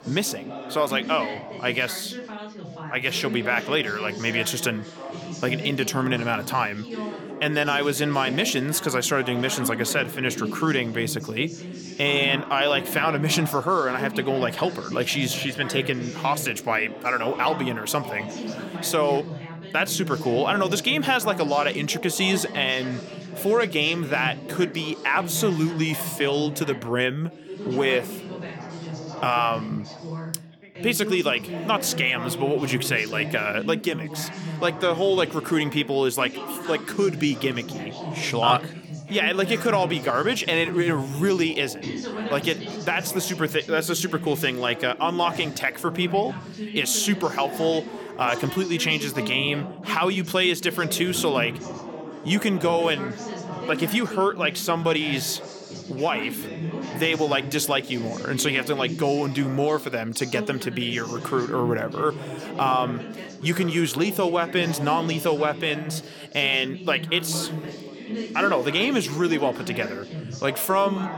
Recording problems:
background chatter; noticeable; throughout; 3 voices, 10 dB below the speech

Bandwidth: 18 kHz